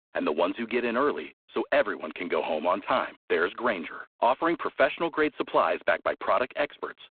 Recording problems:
phone-call audio; poor line; nothing above 4 kHz

